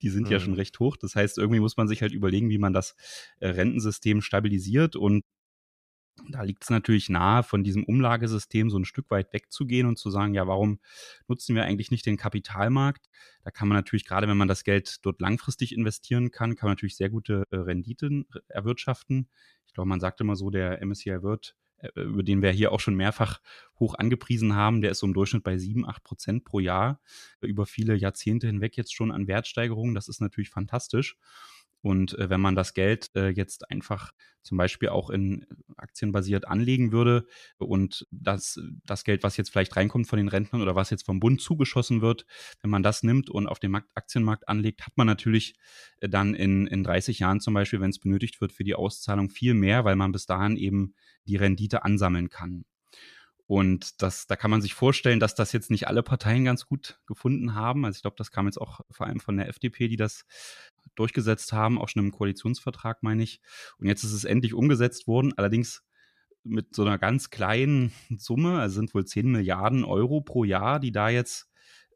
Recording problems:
none

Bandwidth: 14.5 kHz